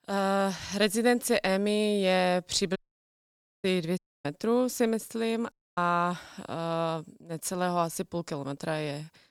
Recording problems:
audio cutting out; at 3 s for 1 s, at 4 s and at 5.5 s

